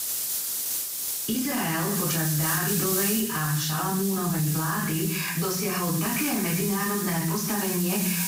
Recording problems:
off-mic speech; far
room echo; noticeable; dies away in 0.5 s
high frequencies cut off; noticeable; nothing above 8 kHz
squashed, flat; somewhat
hiss; loud; throughout; 1 dB below the speech

